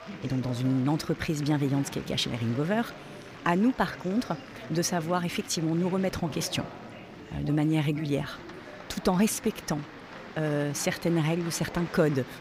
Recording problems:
murmuring crowd; noticeable; throughout; 15 dB below the speech

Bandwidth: 15.5 kHz